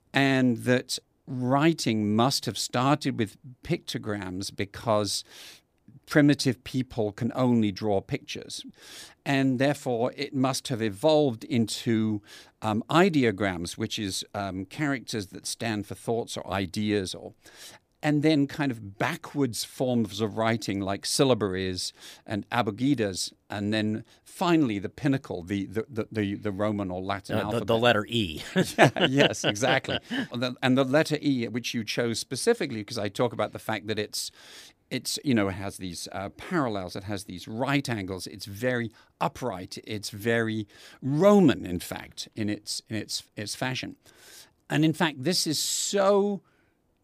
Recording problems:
none

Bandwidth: 15 kHz